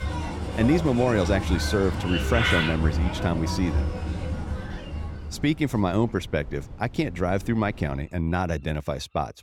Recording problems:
animal sounds; loud; throughout; 3 dB below the speech
wind noise on the microphone; occasional gusts; from 3 to 8 s; 25 dB below the speech

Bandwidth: 18 kHz